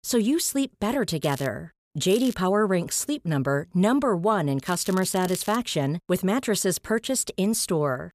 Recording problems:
crackling; noticeable; at 1 s, at 2 s and at 4.5 s; 15 dB below the speech

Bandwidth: 14.5 kHz